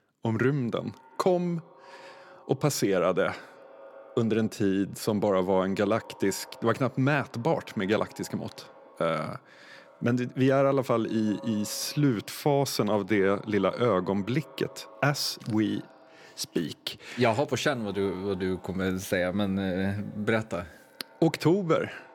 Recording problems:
echo of what is said; faint; throughout; 180 ms later, 25 dB below the speech

